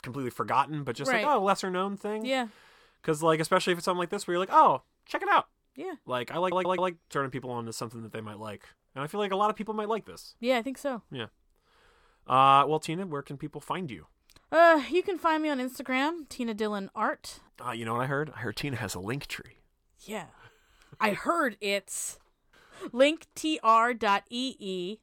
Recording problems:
audio stuttering; at 6.5 s

